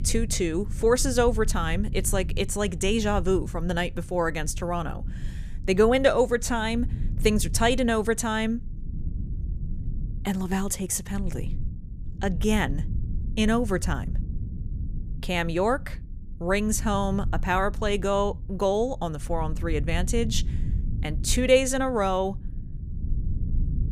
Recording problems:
low rumble; faint; throughout; 20 dB below the speech

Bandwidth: 15 kHz